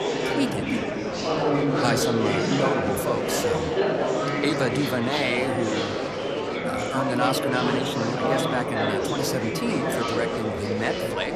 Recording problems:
chatter from many people; very loud; throughout; 3 dB above the speech

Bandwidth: 14.5 kHz